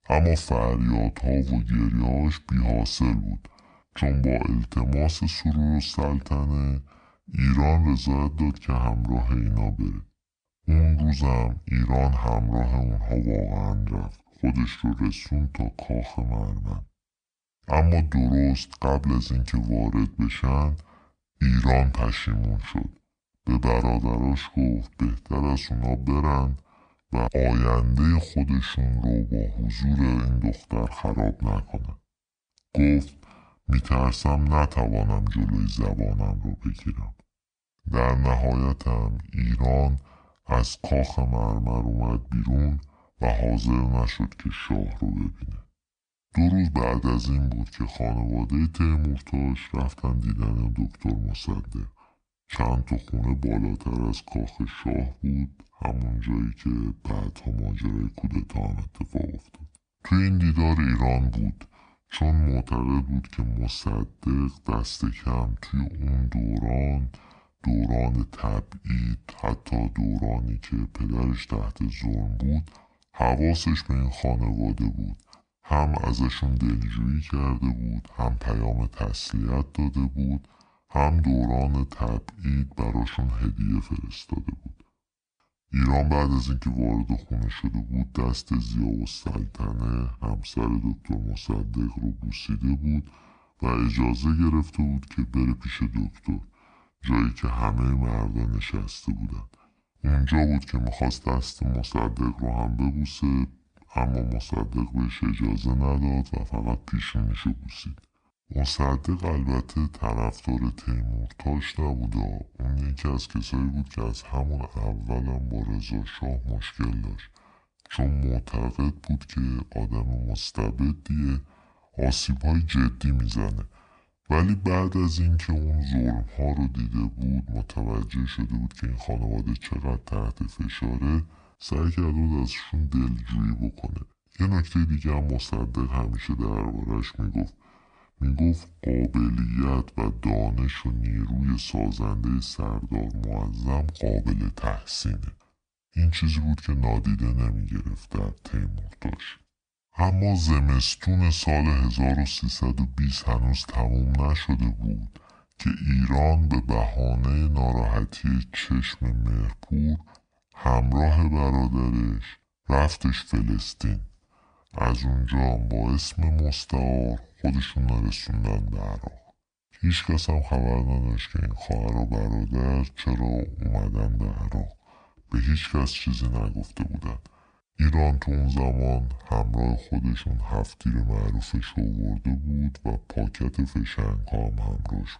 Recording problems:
wrong speed and pitch; too slow and too low; 0.7 times normal speed

